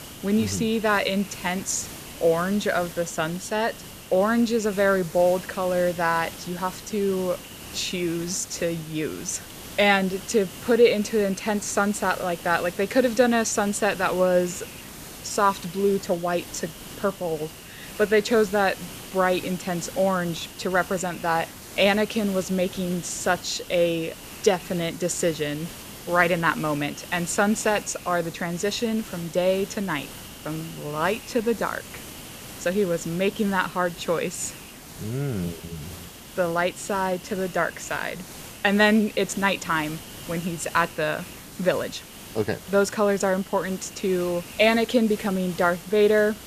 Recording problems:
hiss; noticeable; throughout; 15 dB below the speech

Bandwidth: 14.5 kHz